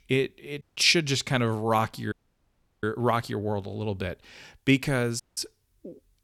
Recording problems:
audio cutting out; at 0.5 s, at 2 s for 0.5 s and at 5 s

